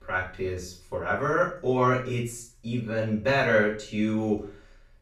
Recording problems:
off-mic speech; far
room echo; noticeable; dies away in 0.4 s

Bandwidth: 15 kHz